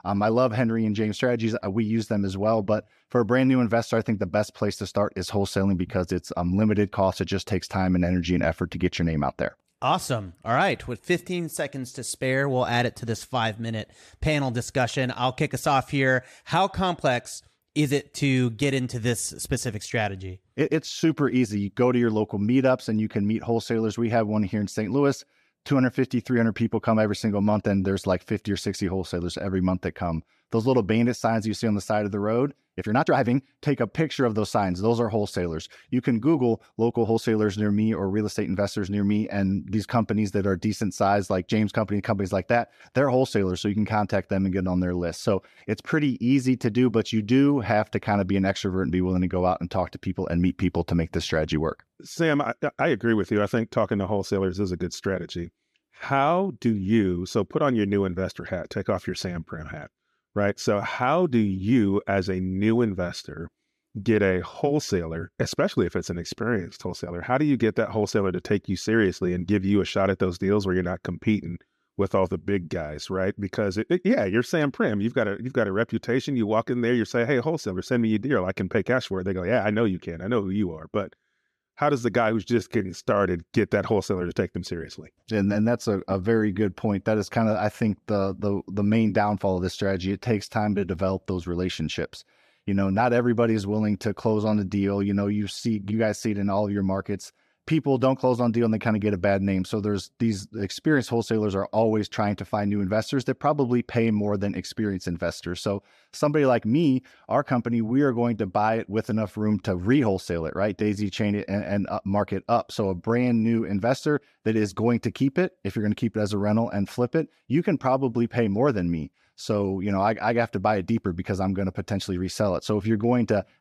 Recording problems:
uneven, jittery; strongly; from 21 s to 1:52

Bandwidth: 14 kHz